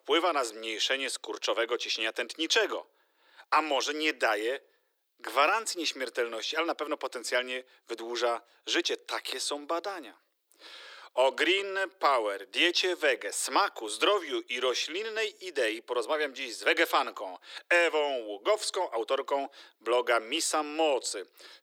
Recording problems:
thin; very; fading below 350 Hz

